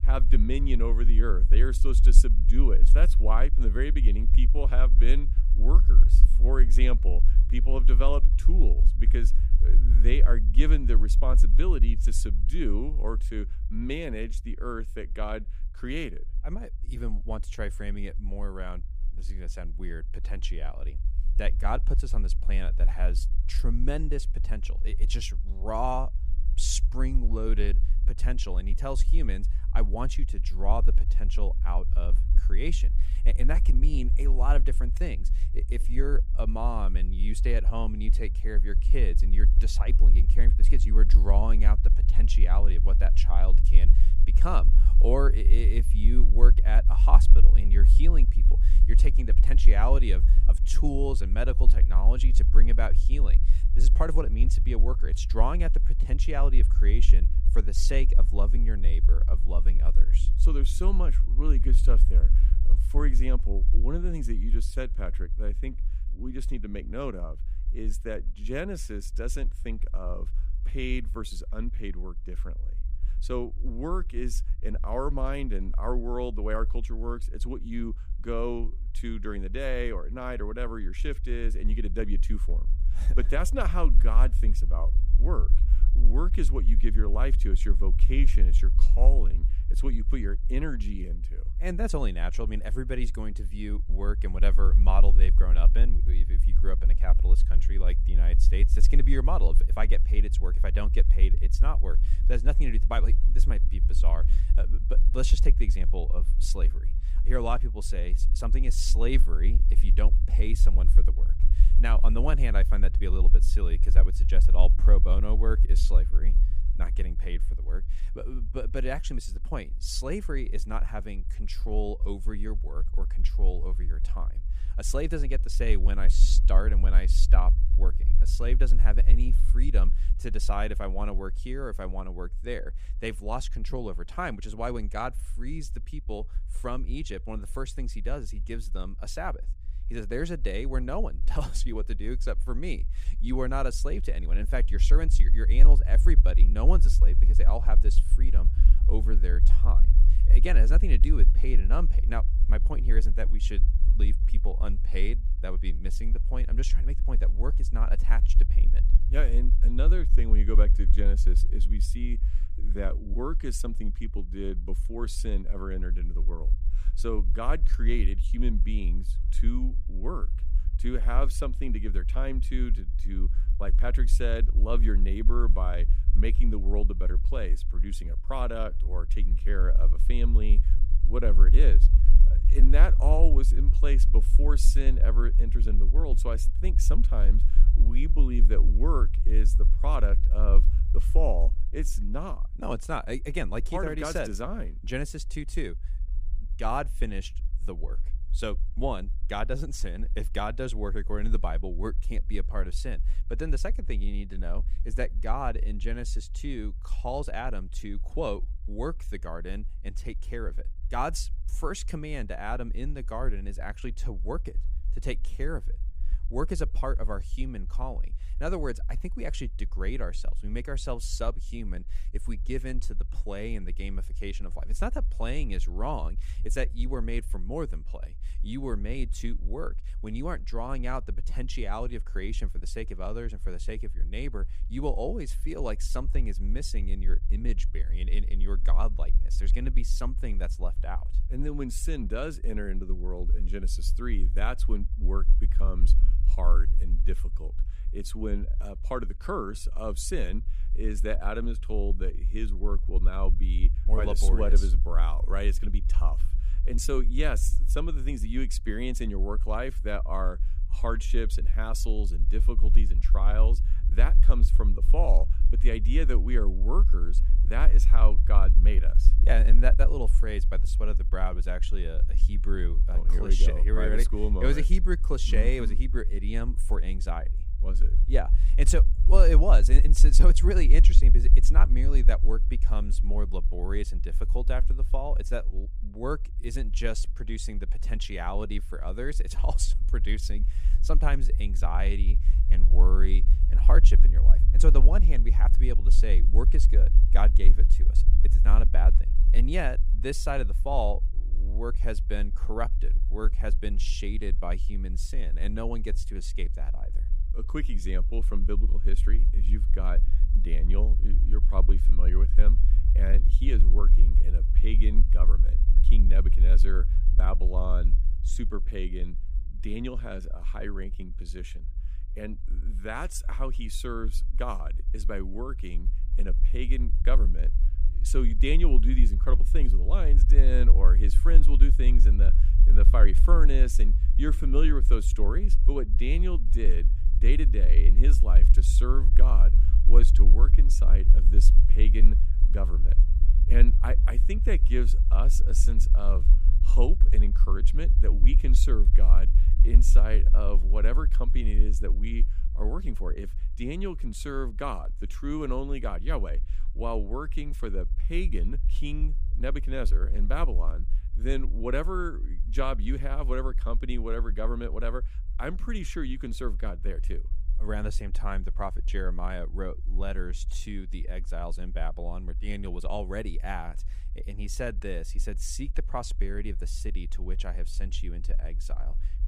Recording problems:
low rumble; noticeable; throughout; 15 dB below the speech

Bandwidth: 15 kHz